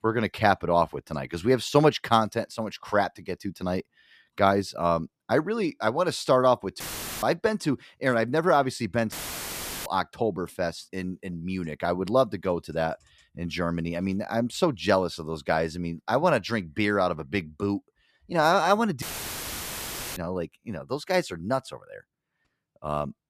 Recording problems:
audio cutting out; filled with static; at 7 s, at 9 s for 0.5 s and at 19 s for 1 s

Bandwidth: 14.5 kHz